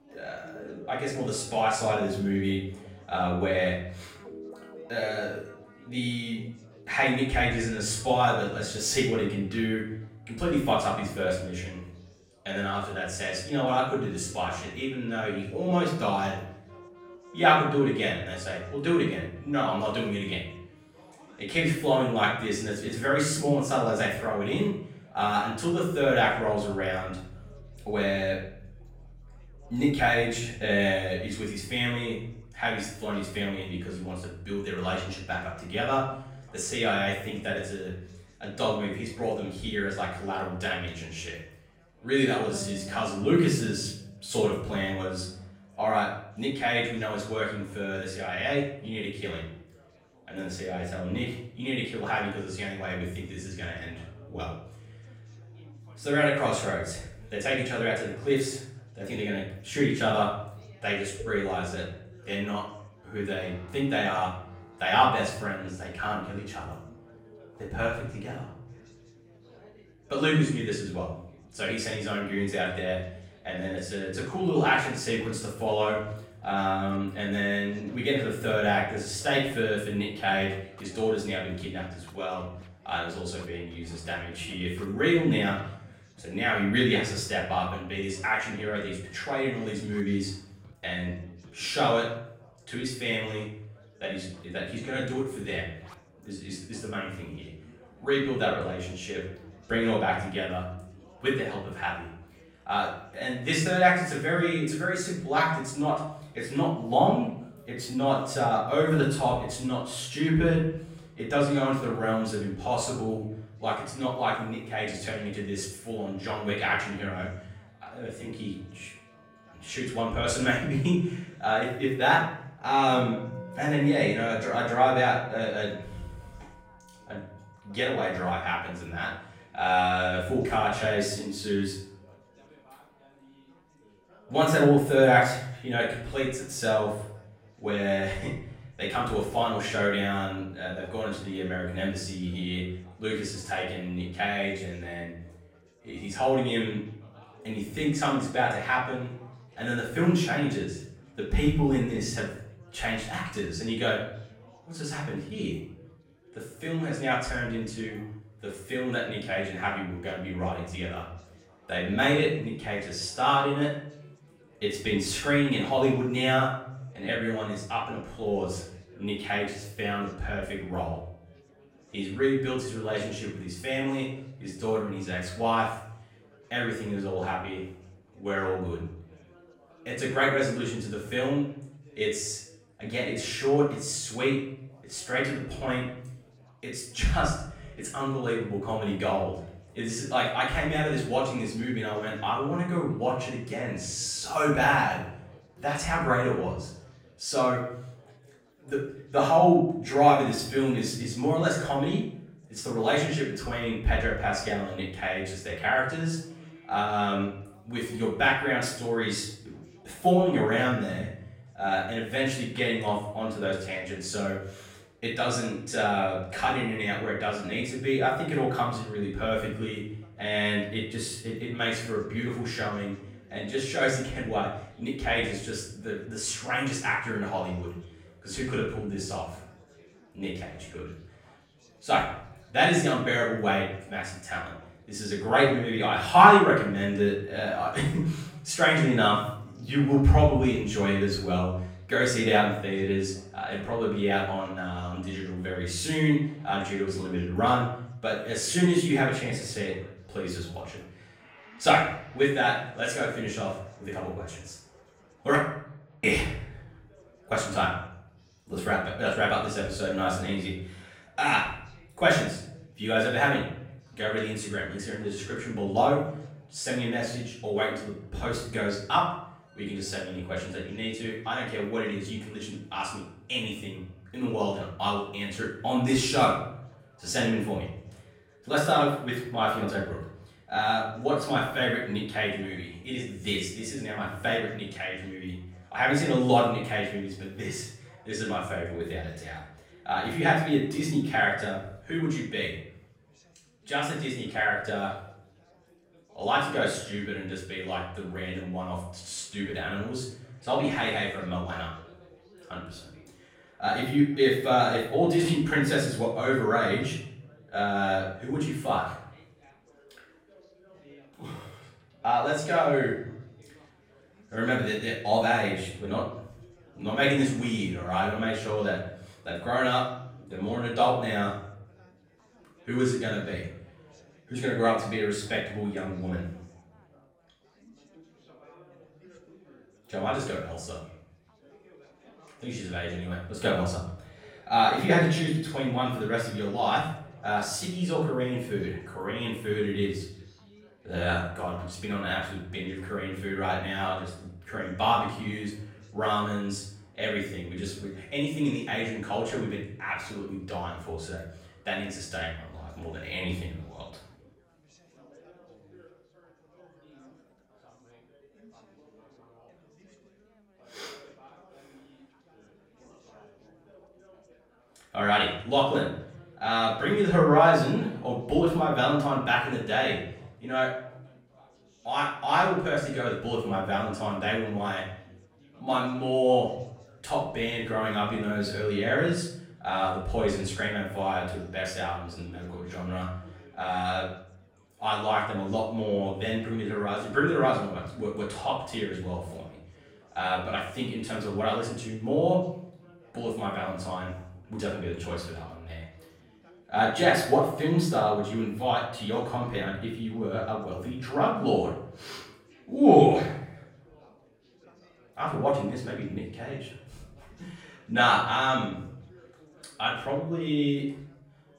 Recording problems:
off-mic speech; far
room echo; noticeable; dies away in 0.6 s
background music; faint; throughout; 25 dB below the speech
chatter from many people; faint; throughout; 30 dB below the speech

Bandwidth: 16.5 kHz